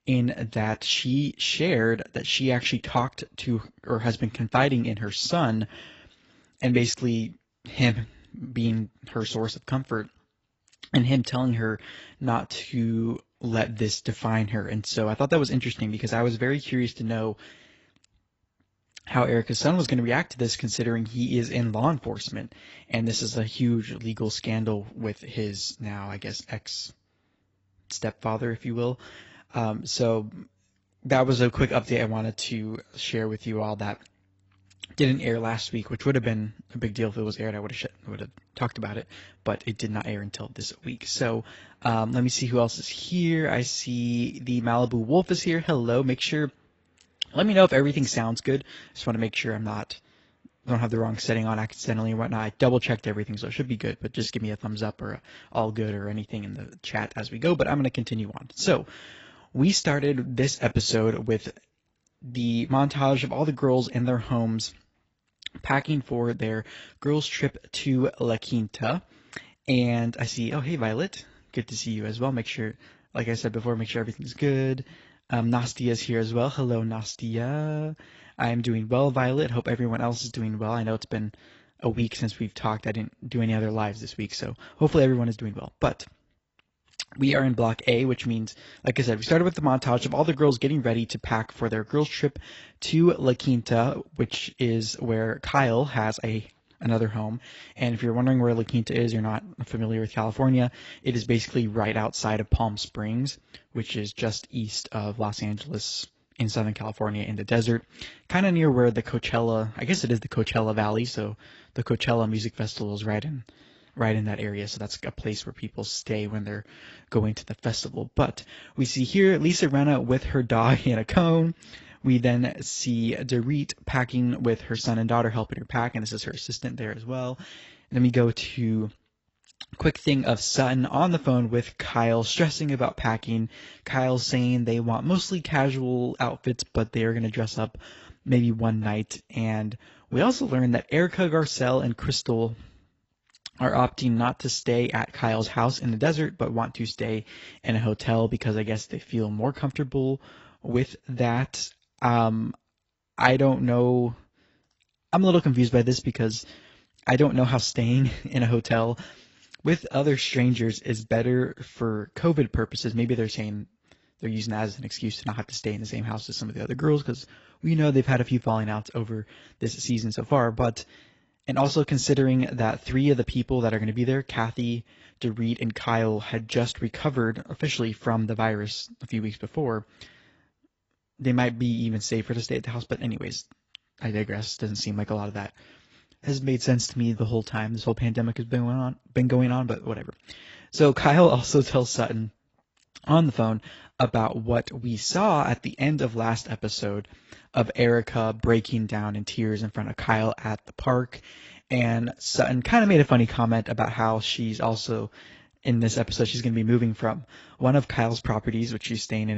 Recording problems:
garbled, watery; badly; nothing above 7.5 kHz
abrupt cut into speech; at the end

